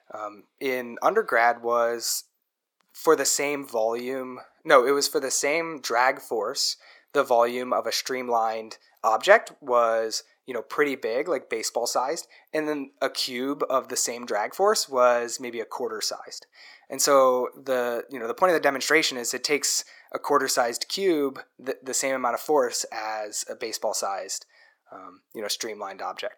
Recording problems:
thin; somewhat; fading below 400 Hz

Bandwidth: 18 kHz